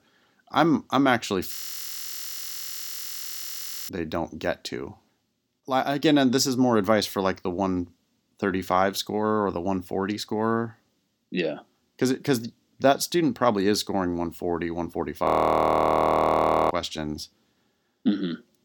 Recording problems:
audio freezing; at 1.5 s for 2.5 s and at 15 s for 1.5 s

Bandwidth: 18 kHz